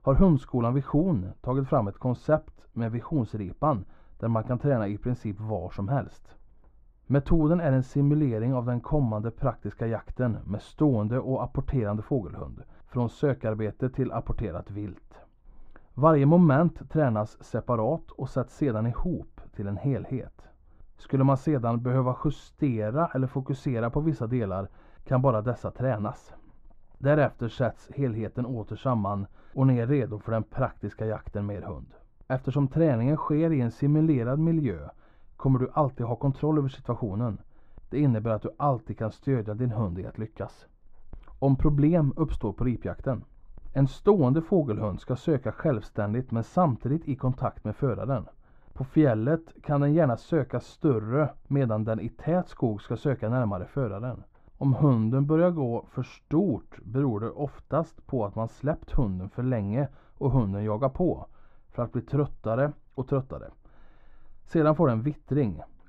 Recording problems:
muffled; very; fading above 3 kHz

